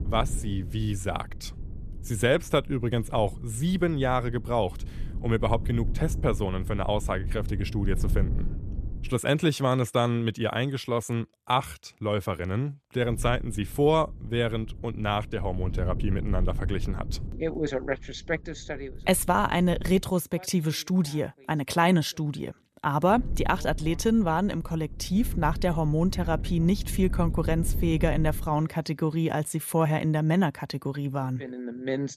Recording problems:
low rumble; noticeable; until 9 s, from 13 to 20 s and from 23 to 29 s; 20 dB below the speech

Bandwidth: 14.5 kHz